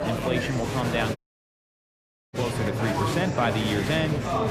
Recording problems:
murmuring crowd; very loud; throughout; as loud as the speech
audio cutting out; at 1 s for 1 s

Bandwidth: 14.5 kHz